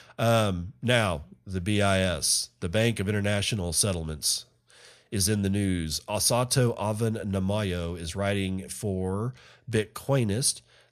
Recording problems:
none

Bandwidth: 14.5 kHz